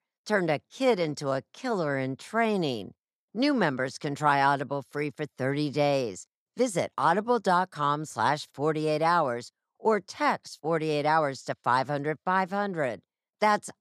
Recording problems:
none

